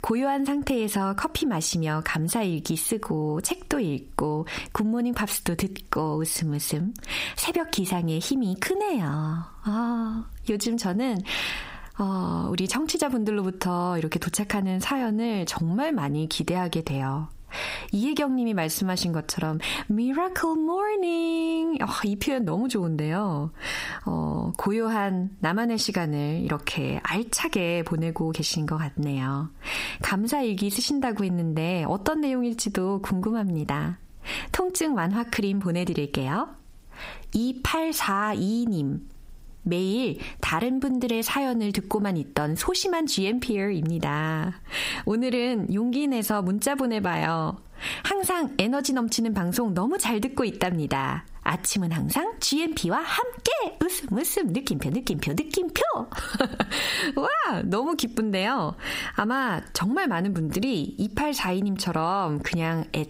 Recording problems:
squashed, flat; heavily

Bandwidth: 15.5 kHz